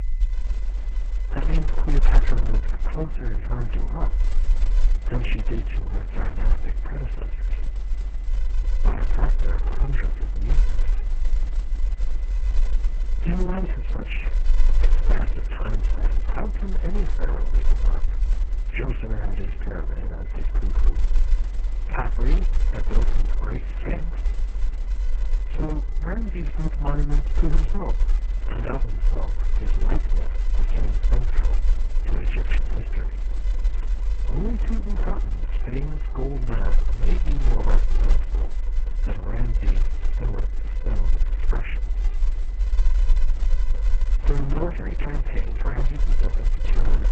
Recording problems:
garbled, watery; badly; nothing above 3 kHz
low rumble; loud; throughout; 7 dB below the speech
high-pitched whine; faint; throughout; 2 kHz, 25 dB below the speech

